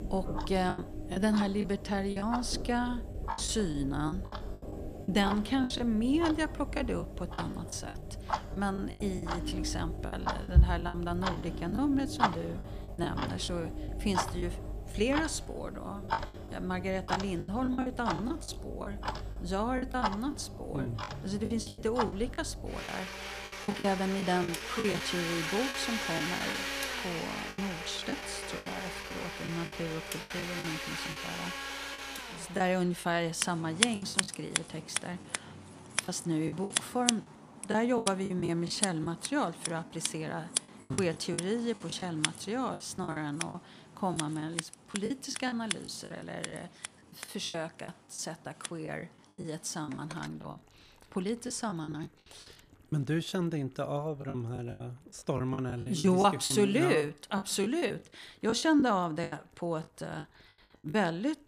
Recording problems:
household noises; loud; throughout; 3 dB below the speech
choppy; very; 11% of the speech affected

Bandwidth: 14.5 kHz